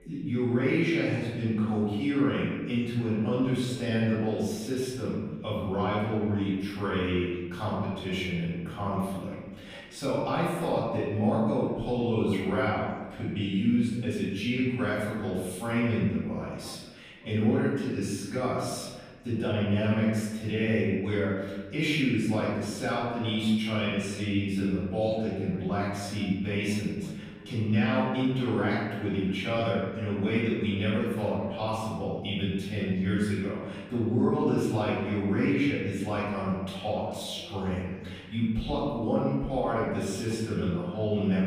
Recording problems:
room echo; strong; dies away in 1.2 s
off-mic speech; far
voice in the background; faint; throughout; 25 dB below the speech

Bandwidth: 15.5 kHz